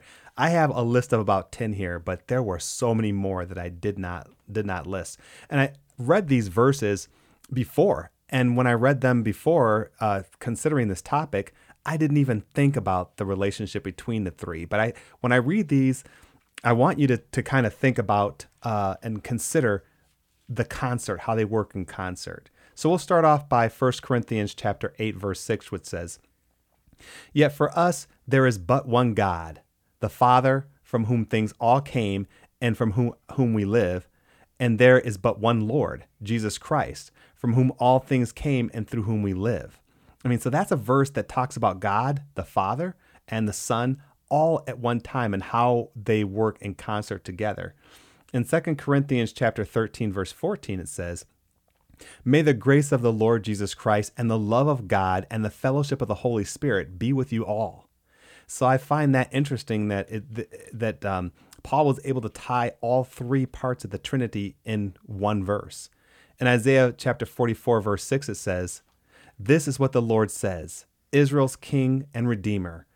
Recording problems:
none

